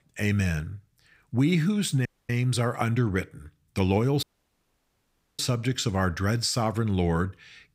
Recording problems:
audio cutting out; at 2 s and at 4 s for 1 s

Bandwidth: 15.5 kHz